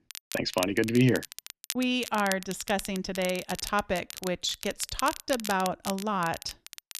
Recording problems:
crackle, like an old record; loud; 10 dB below the speech

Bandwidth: 13.5 kHz